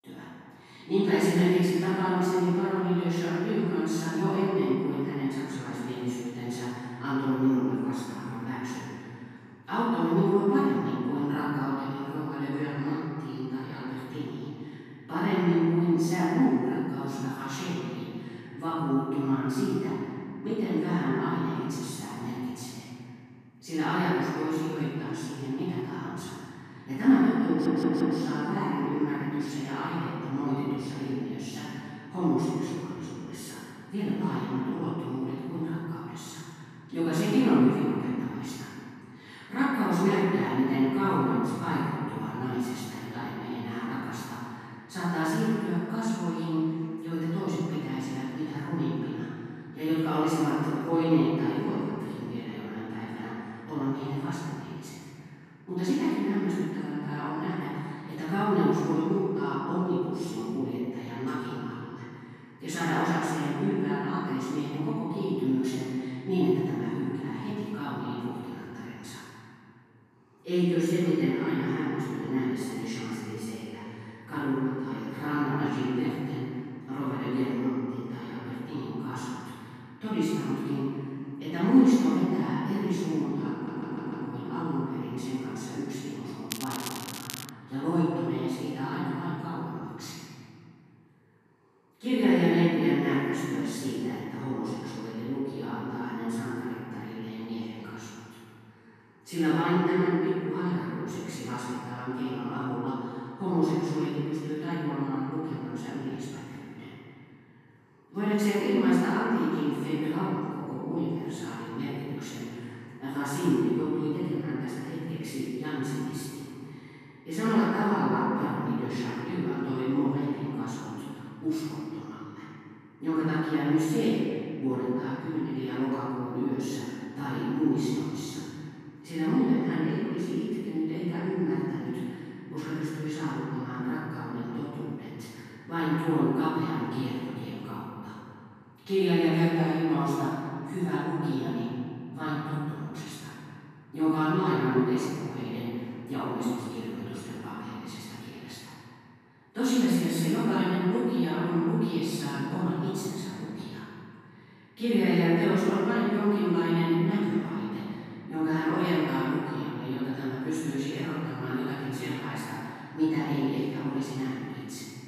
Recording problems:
room echo; strong; dies away in 2.3 s
off-mic speech; far
crackling; loud; from 1:27 to 1:28; 9 dB below the speech
audio stuttering; at 27 s and at 1:24

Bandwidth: 14.5 kHz